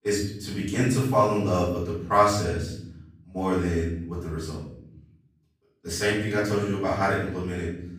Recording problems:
off-mic speech; far
room echo; noticeable; dies away in 0.9 s

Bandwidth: 15.5 kHz